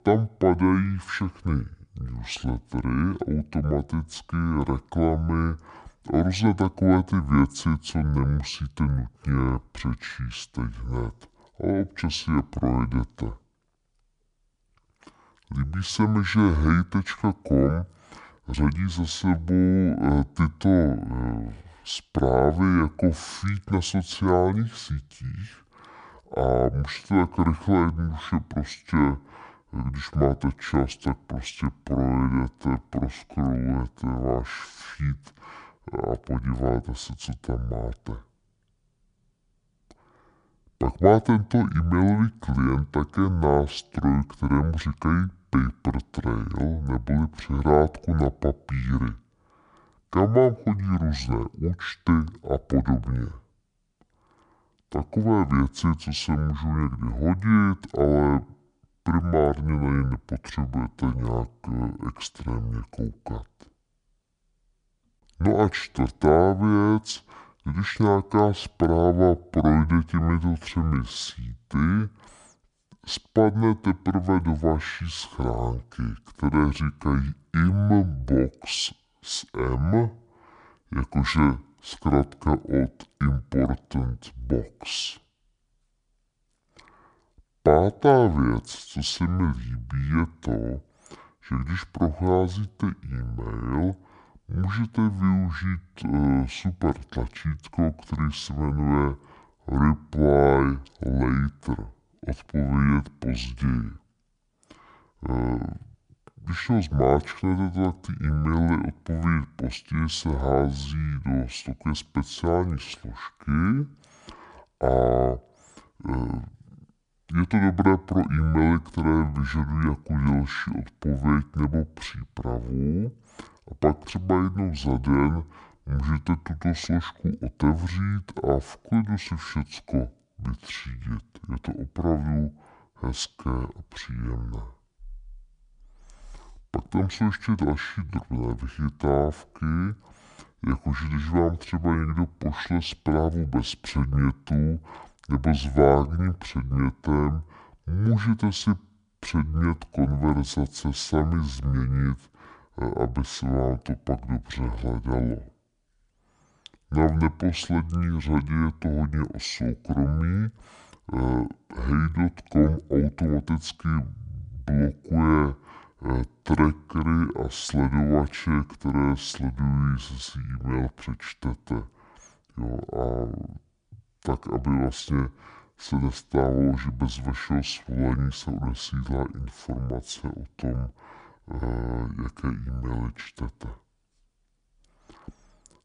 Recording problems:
wrong speed and pitch; too slow and too low; 0.6 times normal speed

